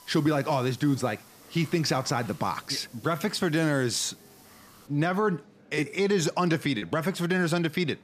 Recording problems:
murmuring crowd; faint; throughout; 30 dB below the speech
hiss; faint; until 5 s; 25 dB below the speech
choppy; occasionally; 1% of the speech affected

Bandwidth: 14.5 kHz